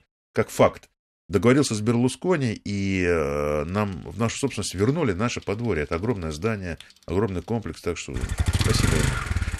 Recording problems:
traffic noise; loud; from 4 s on; as loud as the speech

